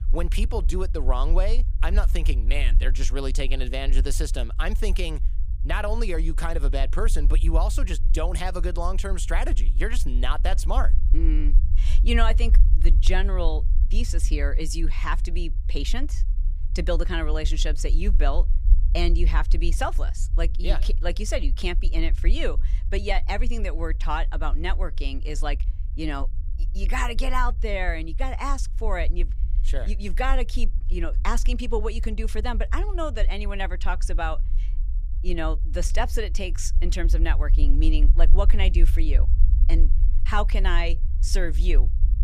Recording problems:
low rumble; noticeable; throughout; 20 dB below the speech

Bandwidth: 15 kHz